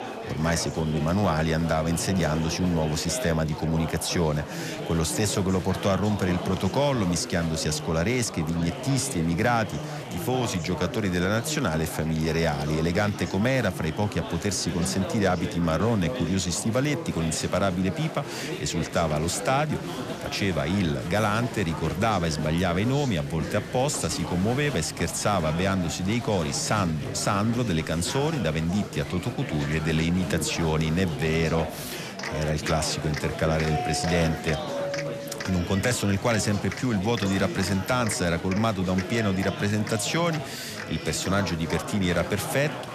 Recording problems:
chatter from many people; loud; throughout; 8 dB below the speech
doorbell; noticeable; from 34 to 36 s; peak 6 dB below the speech

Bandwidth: 14 kHz